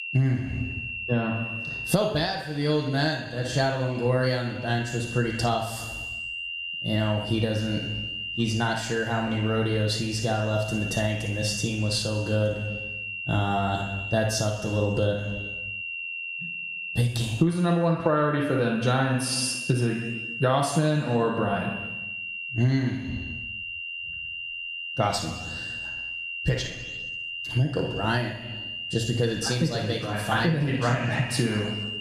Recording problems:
squashed, flat; heavily
room echo; noticeable; dies away in 1 s
off-mic speech; somewhat distant
high-pitched whine; loud; throughout; 3 kHz, 8 dB below the speech

